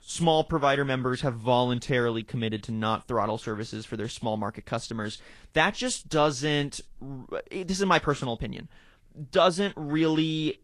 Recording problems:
garbled, watery; slightly

